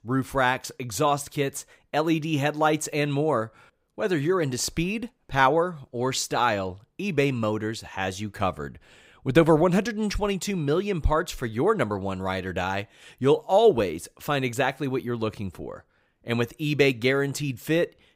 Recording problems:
none

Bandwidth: 15.5 kHz